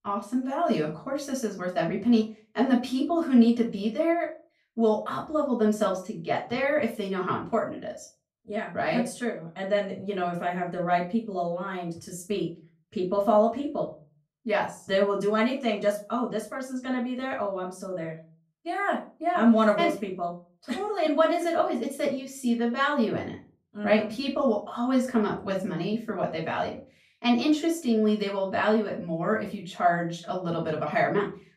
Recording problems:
off-mic speech; far
room echo; slight; dies away in 0.3 s

